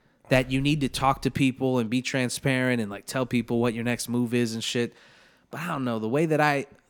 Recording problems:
none

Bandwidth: 18.5 kHz